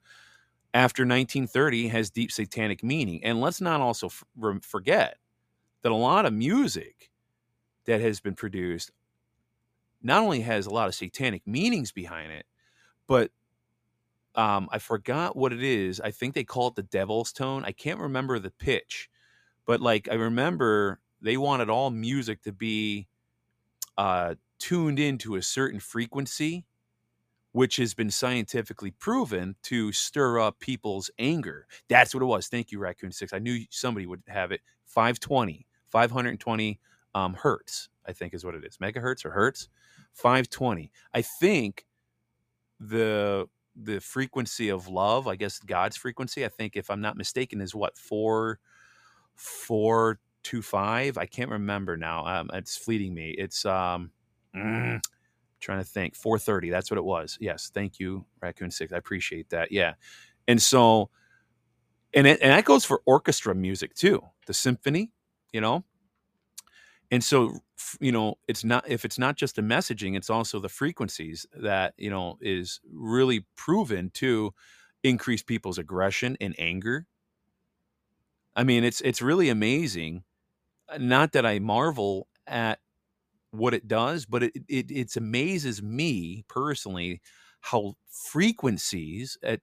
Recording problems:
none

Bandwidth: 15 kHz